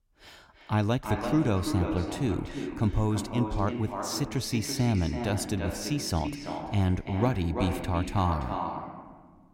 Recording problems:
echo of what is said; strong; throughout; 340 ms later, 6 dB below the speech

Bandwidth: 16 kHz